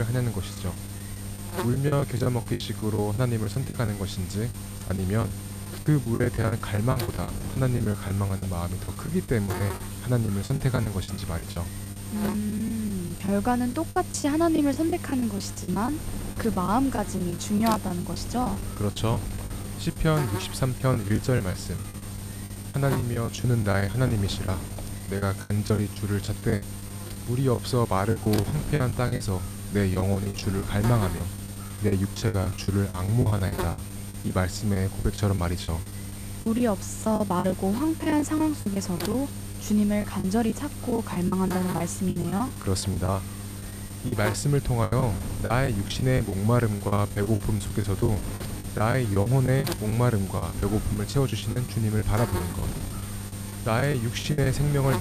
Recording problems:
electrical hum; loud; throughout; 50 Hz, 10 dB below the speech
wind noise on the microphone; occasional gusts; 15 dB below the speech
choppy; very; 14% of the speech affected
abrupt cut into speech; at the start and the end

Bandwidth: 14.5 kHz